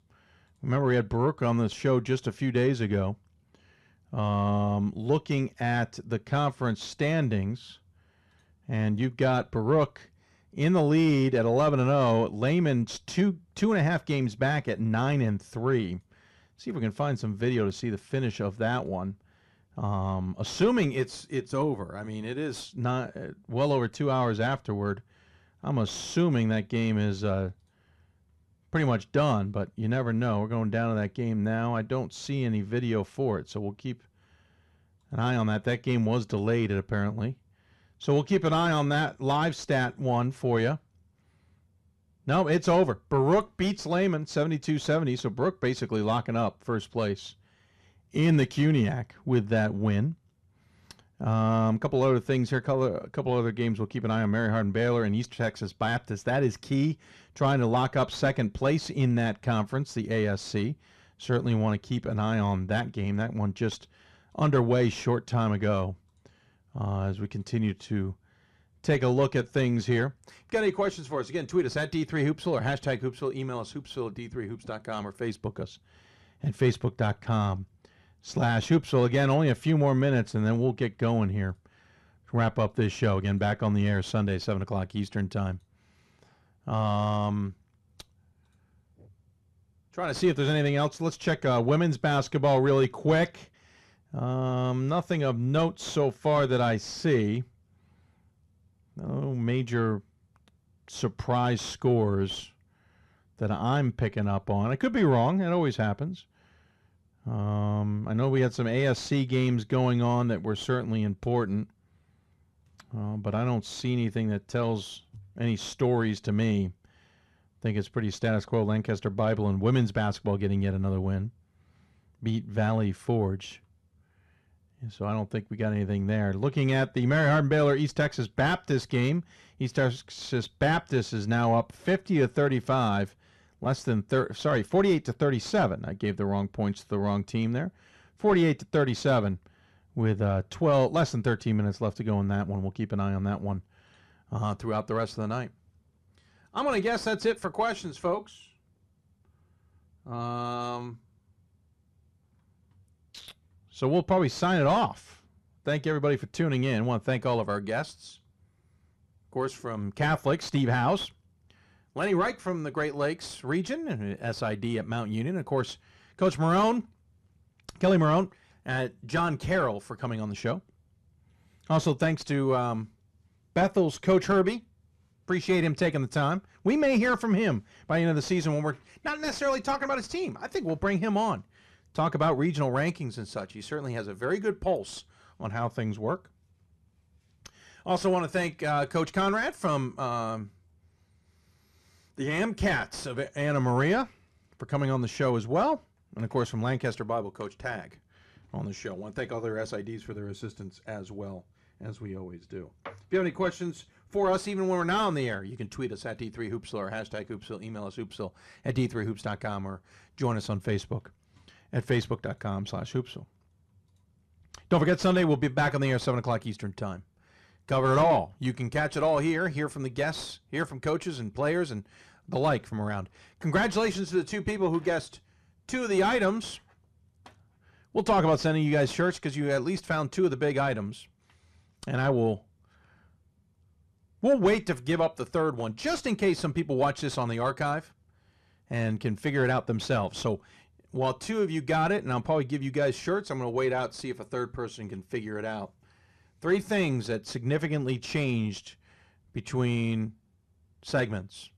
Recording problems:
distortion; slight; 10 dB below the speech

